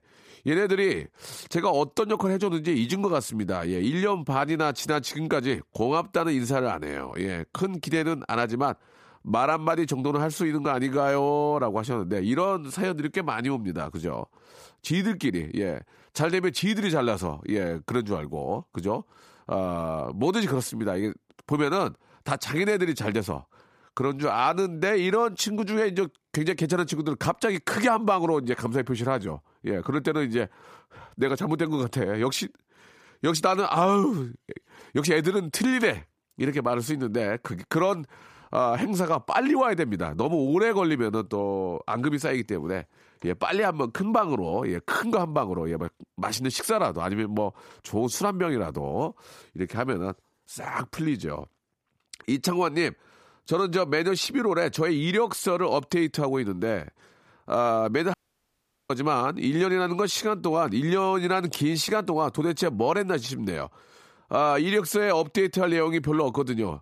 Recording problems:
audio cutting out; at 58 s for 1 s

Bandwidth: 15 kHz